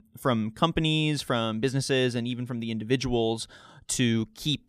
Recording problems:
none

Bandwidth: 15 kHz